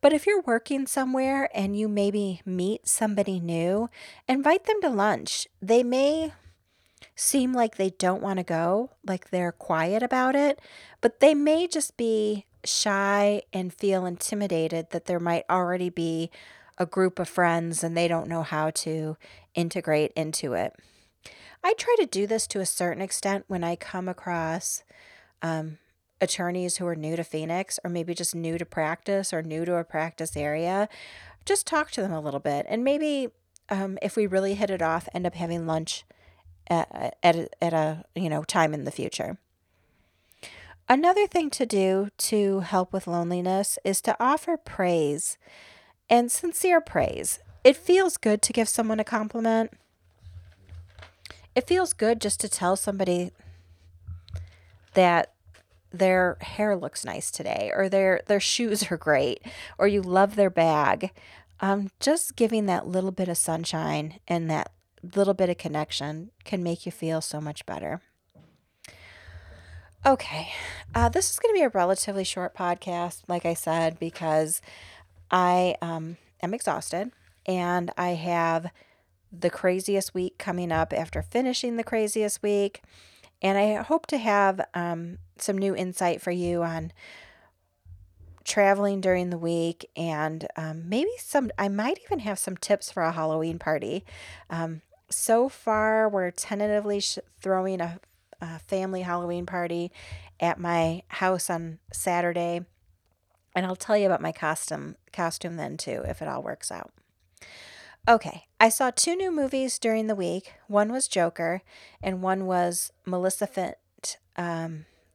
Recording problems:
none

